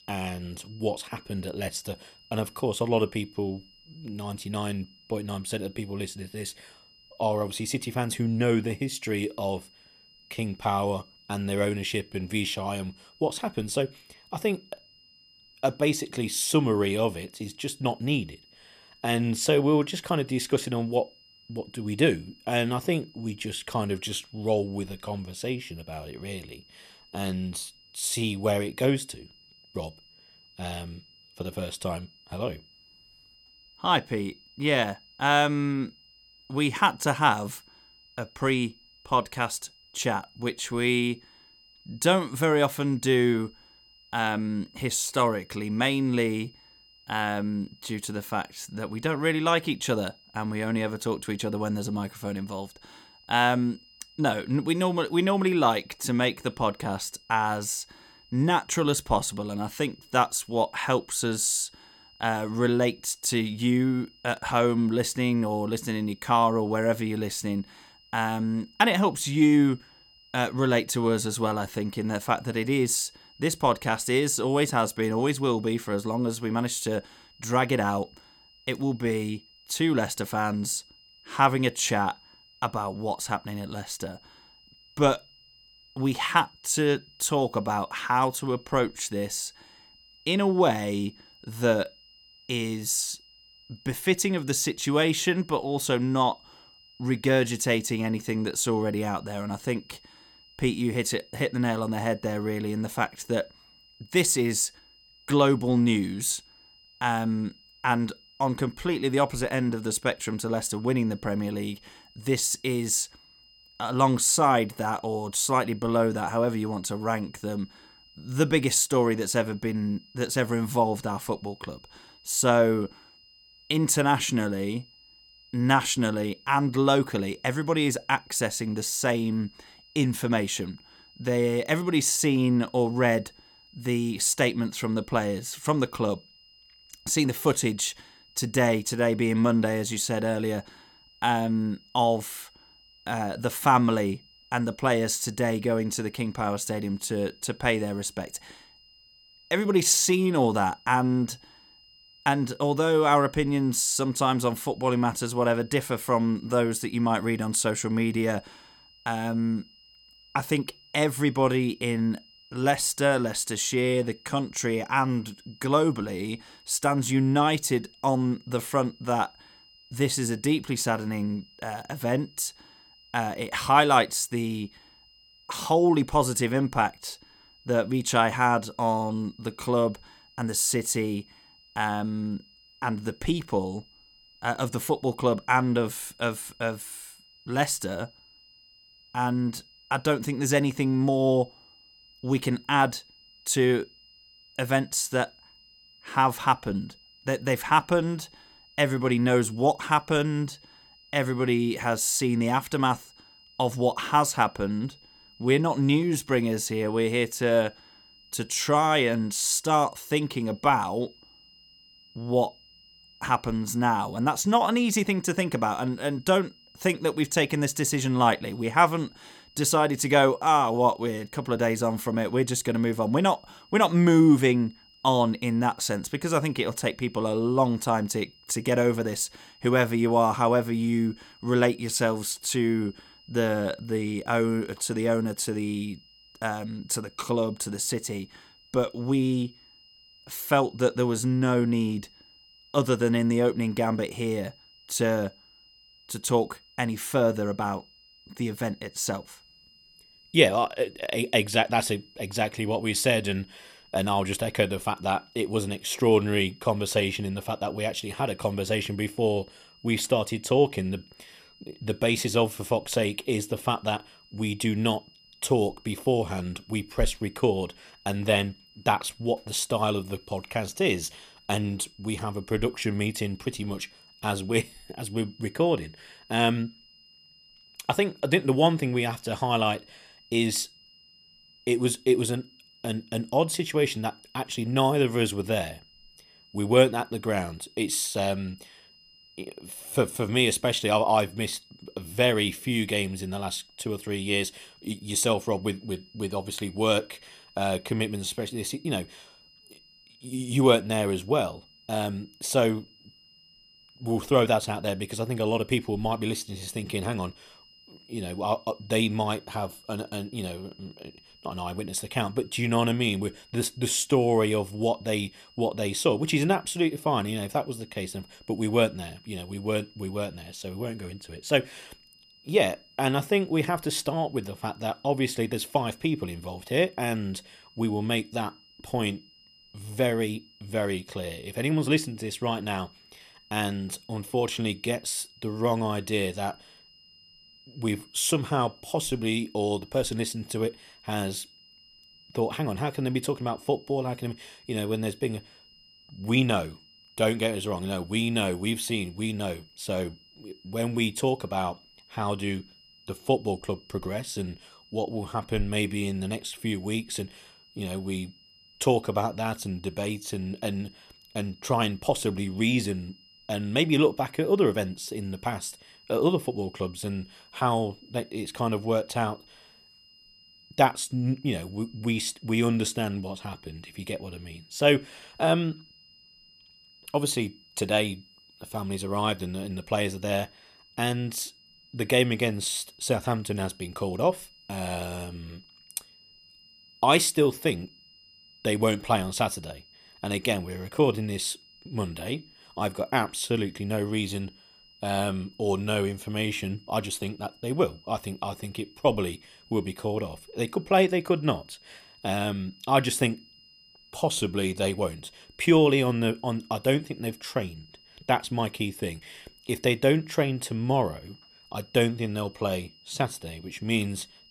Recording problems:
high-pitched whine; faint; throughout; 5 kHz, 25 dB below the speech

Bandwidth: 17.5 kHz